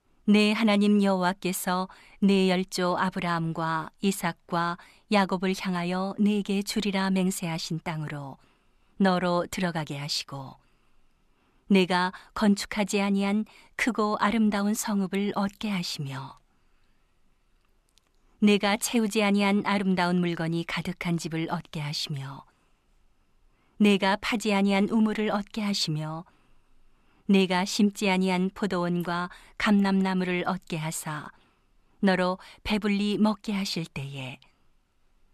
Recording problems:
none

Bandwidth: 13.5 kHz